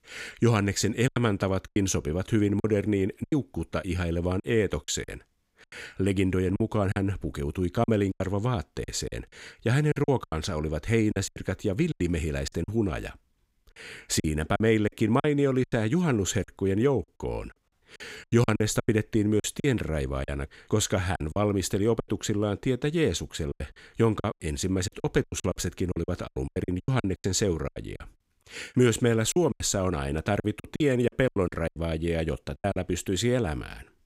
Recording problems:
choppy; very; 12% of the speech affected

